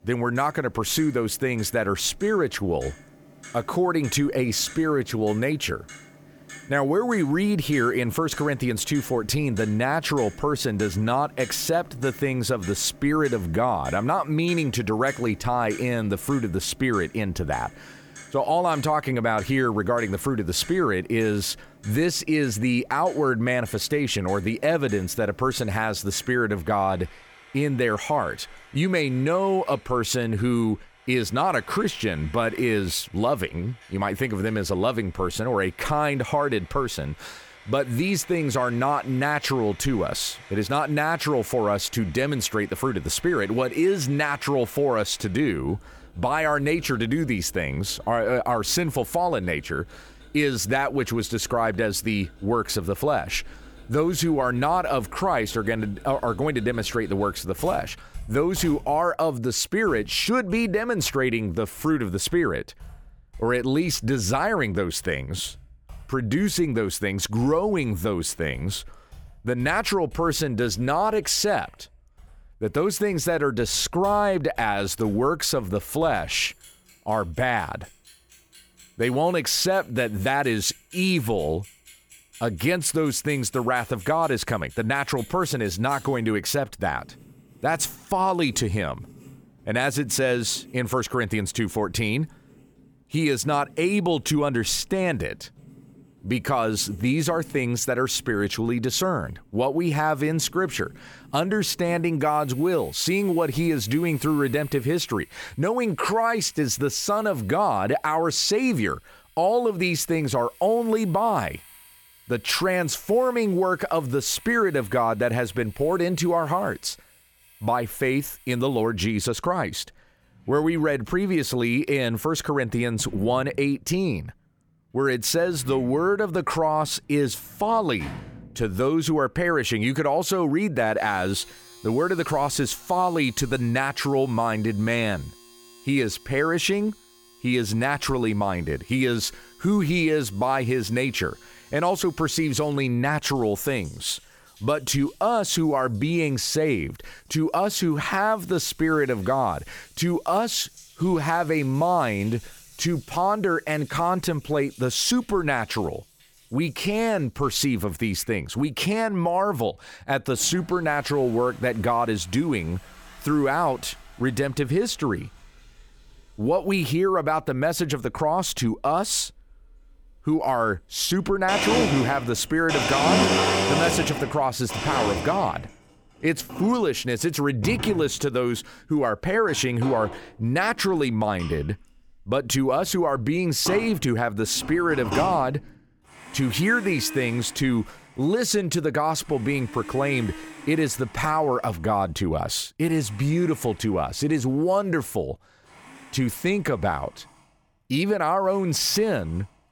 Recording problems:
household noises; noticeable; throughout; 15 dB below the speech

